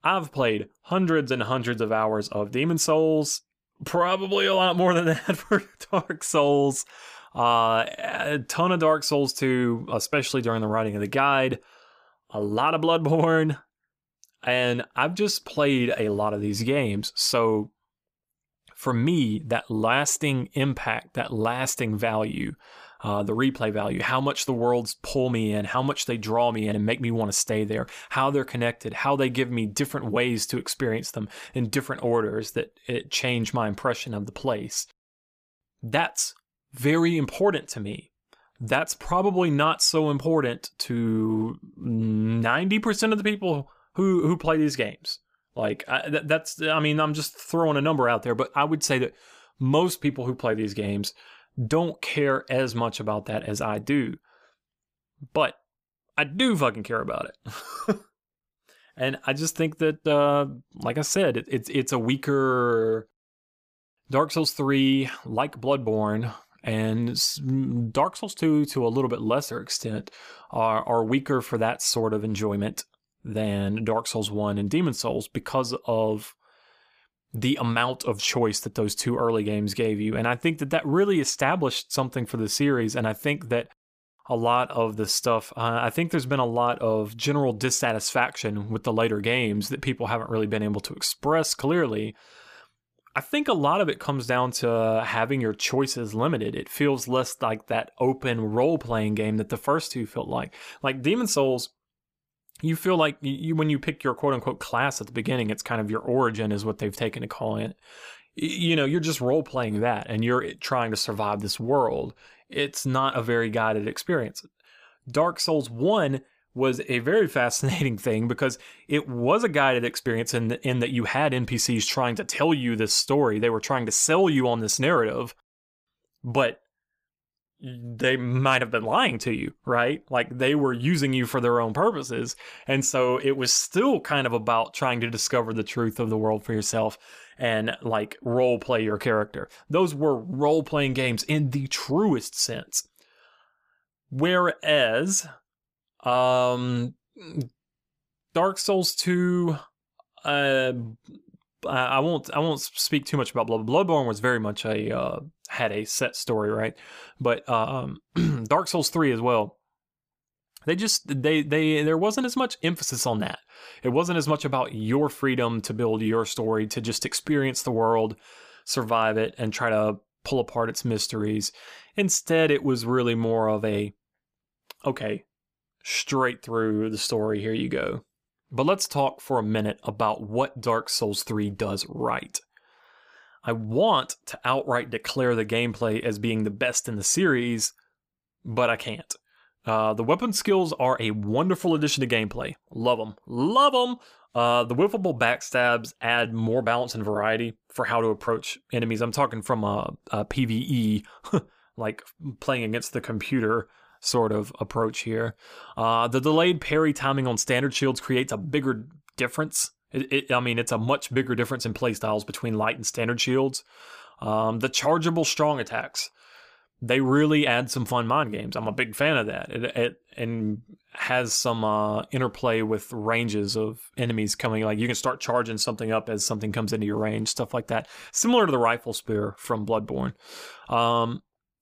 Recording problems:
none

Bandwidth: 15 kHz